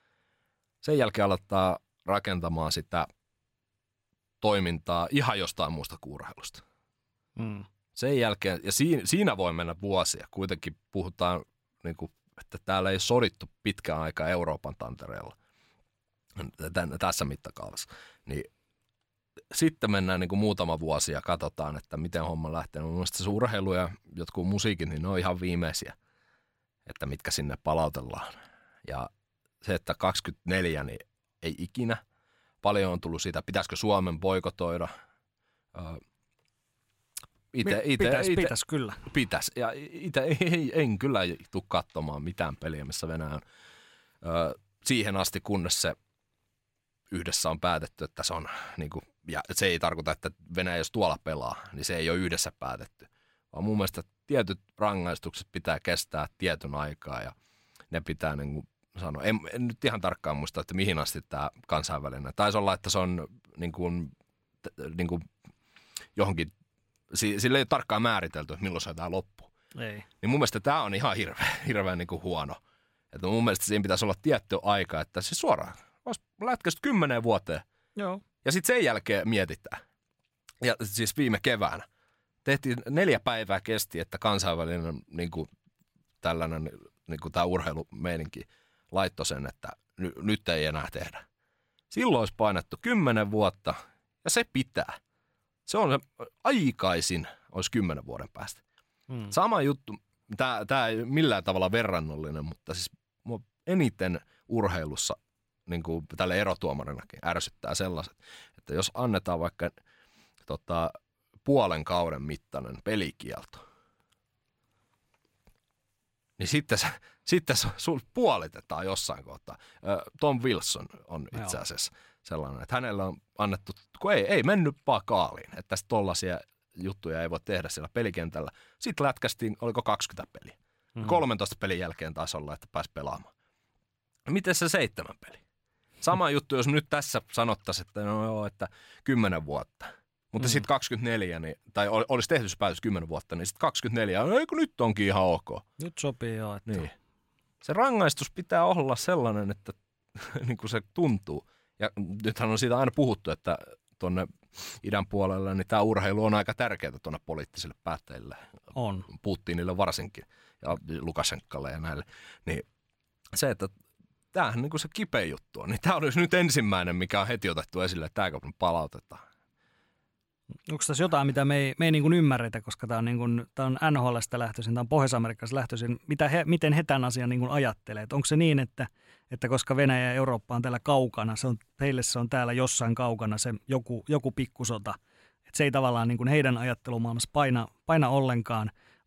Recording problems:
none

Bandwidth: 16 kHz